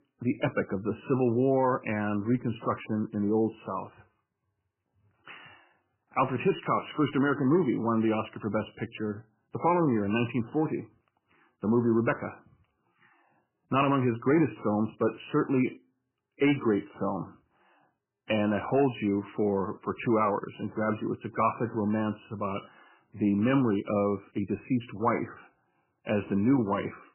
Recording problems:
garbled, watery; badly; nothing above 3 kHz

